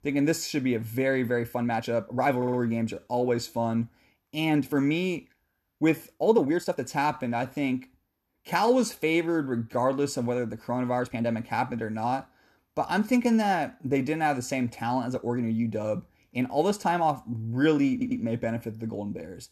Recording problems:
uneven, jittery; strongly; from 1.5 to 18 s
audio stuttering; at 2.5 s and at 18 s

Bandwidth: 13.5 kHz